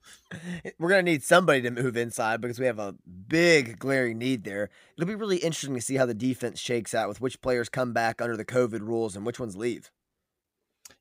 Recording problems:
none

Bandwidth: 15.5 kHz